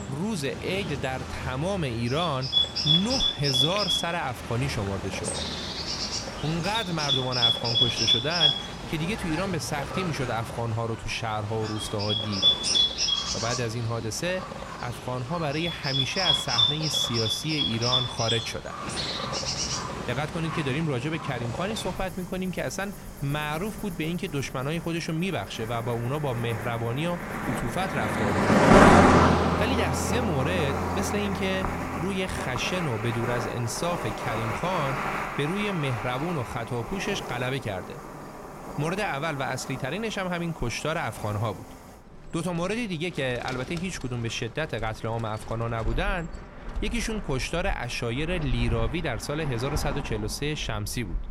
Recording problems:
animal sounds; very loud; throughout; 4 dB above the speech

